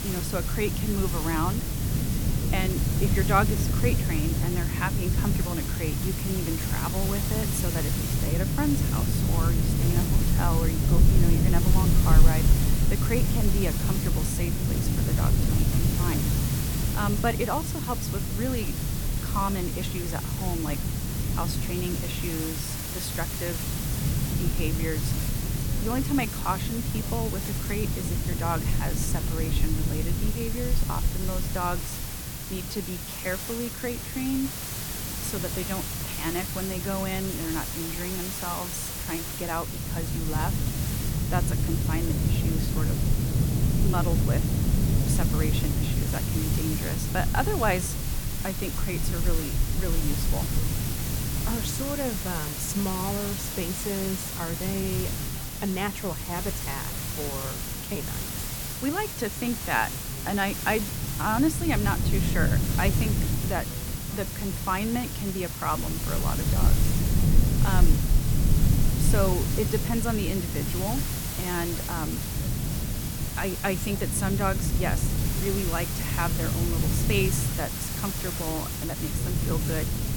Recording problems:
wind noise on the microphone; heavy; 7 dB below the speech
hiss; loud; throughout; 1 dB below the speech
voice in the background; faint; throughout; 20 dB below the speech

